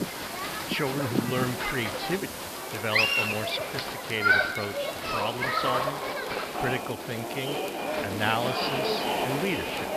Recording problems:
high frequencies cut off; noticeable; nothing above 5.5 kHz
crowd noise; very loud; throughout; 3 dB above the speech
hiss; loud; throughout; 10 dB below the speech
crackle, like an old record; noticeable; 20 dB below the speech

